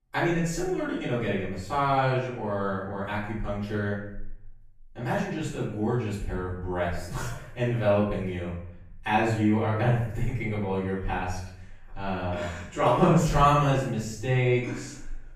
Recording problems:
off-mic speech; far
room echo; noticeable; dies away in 0.7 s

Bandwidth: 15 kHz